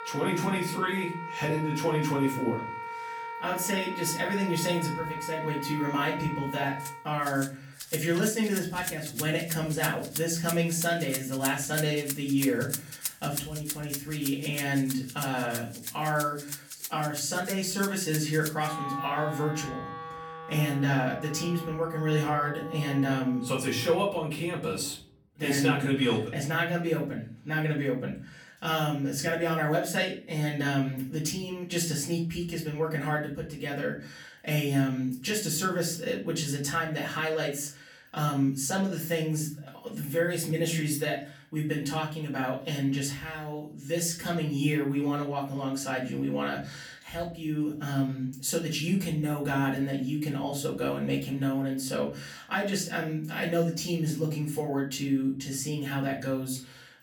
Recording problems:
off-mic speech; far
room echo; slight; dies away in 0.4 s
background music; loud; until 25 s; 8 dB below the speech

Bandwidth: 18.5 kHz